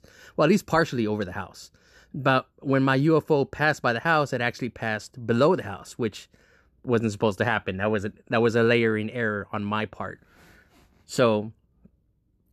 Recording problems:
none

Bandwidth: 13.5 kHz